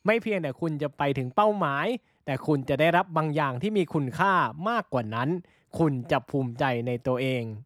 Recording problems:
none

